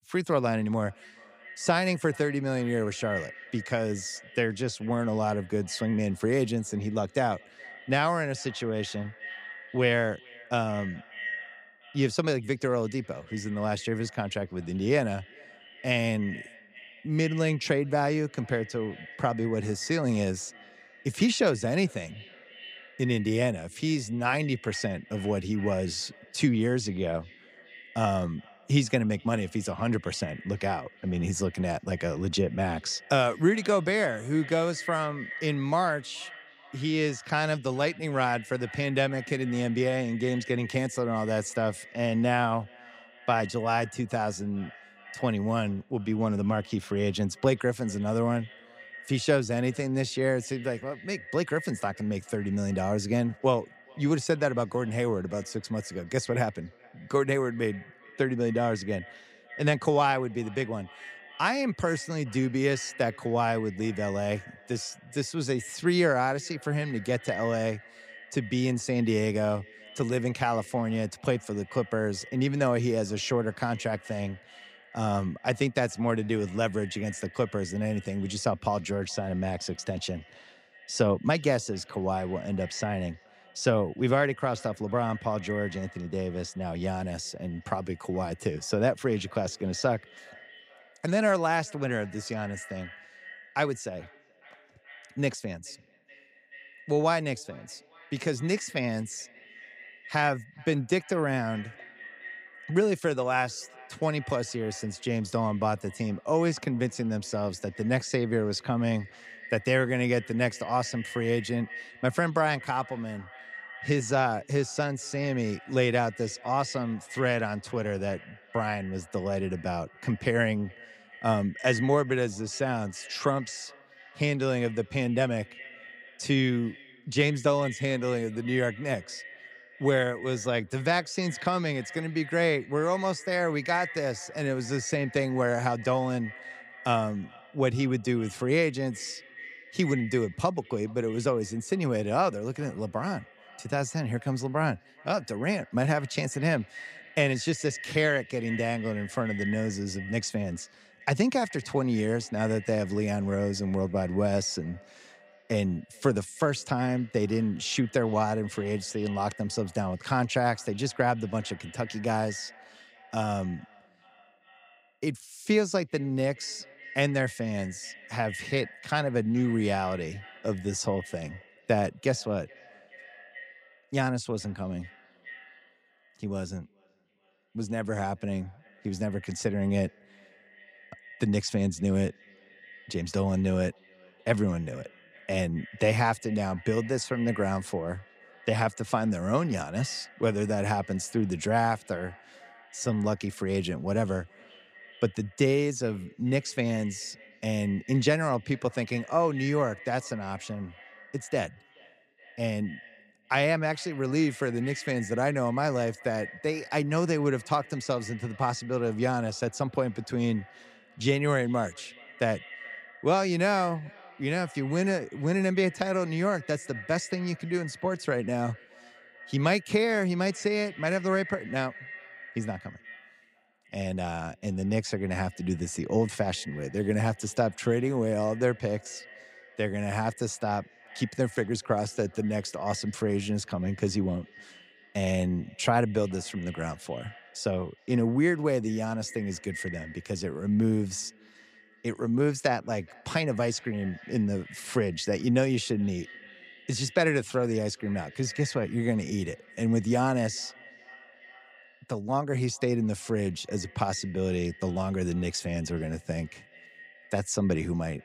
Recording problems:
echo of what is said; noticeable; throughout; 430 ms later, 15 dB below the speech

